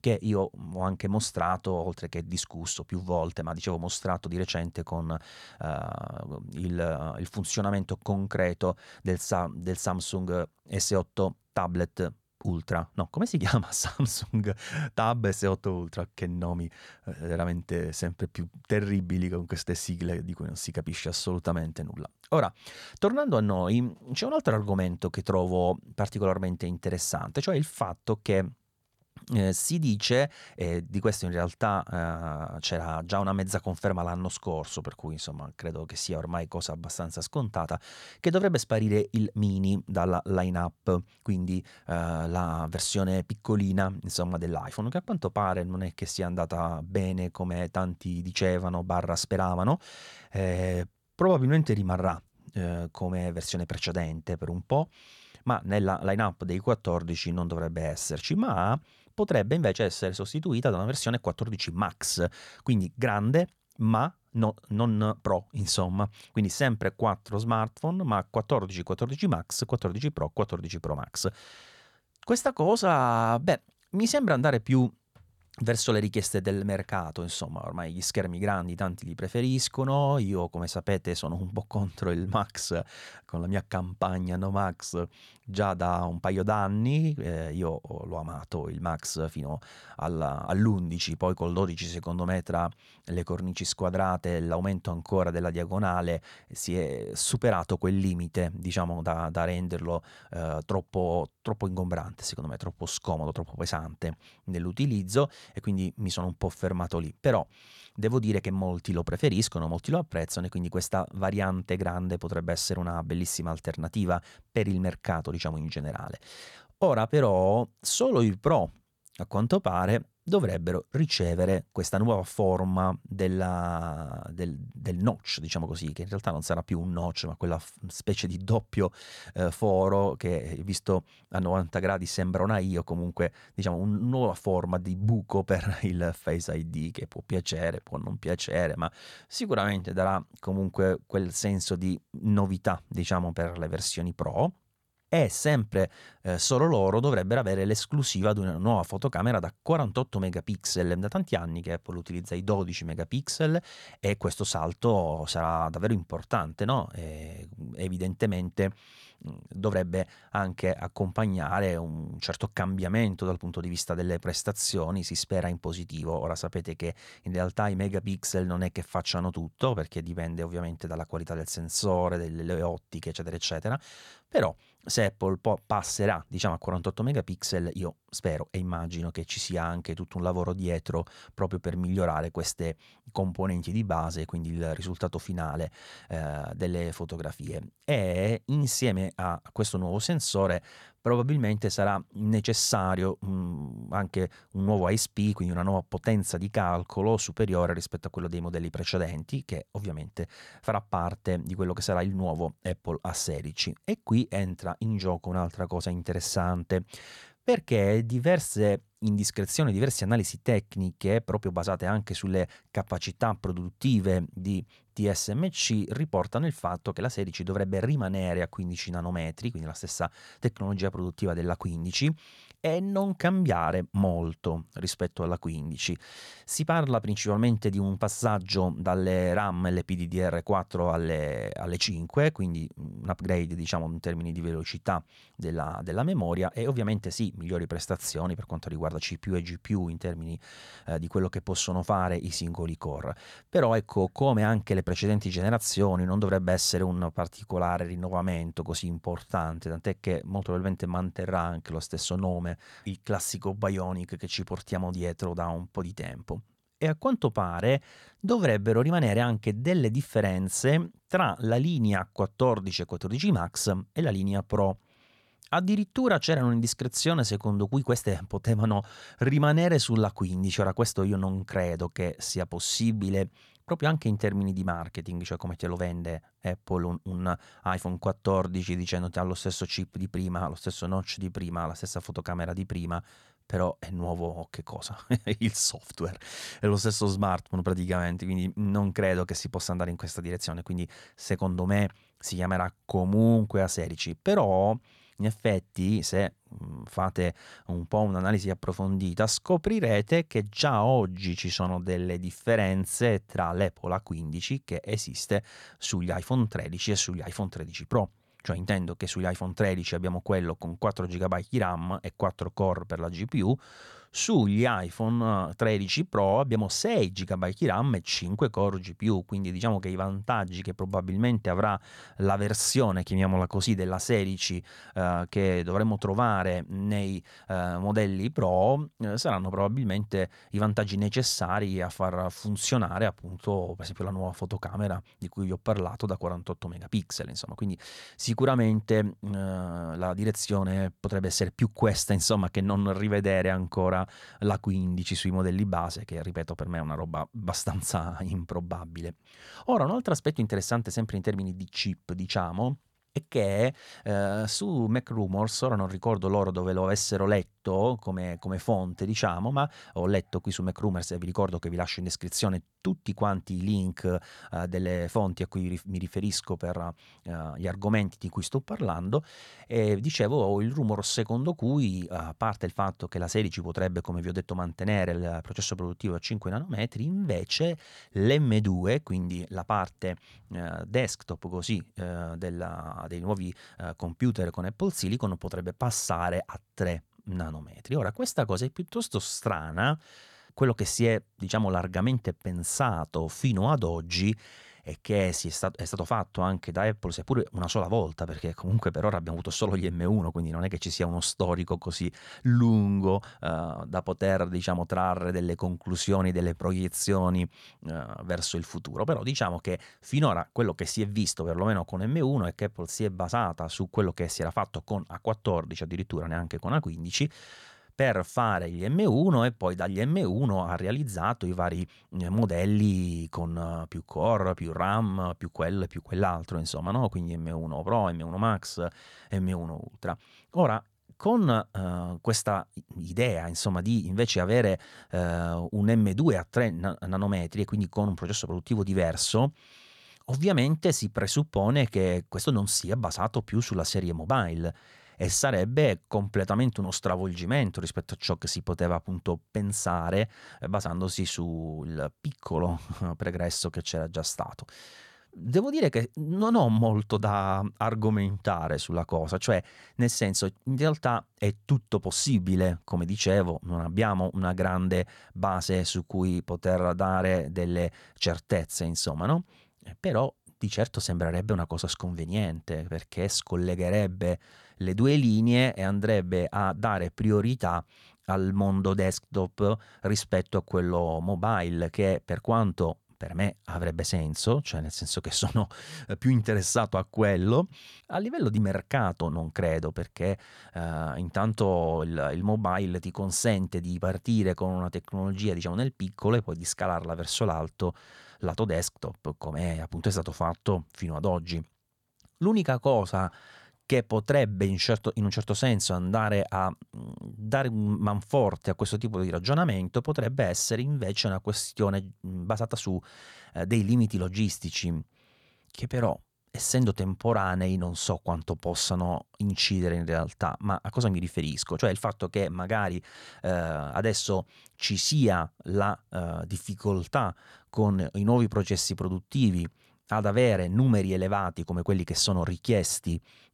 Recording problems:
none

